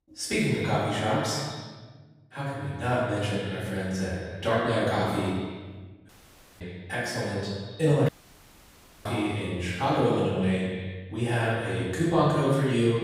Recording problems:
room echo; strong; dies away in 1.2 s
off-mic speech; far
echo of what is said; noticeable; throughout; 110 ms later, 10 dB below the speech
audio cutting out; at 6 s for 0.5 s and at 8 s for 1 s

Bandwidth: 15.5 kHz